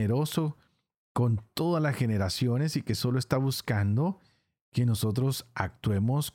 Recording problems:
abrupt cut into speech; at the start

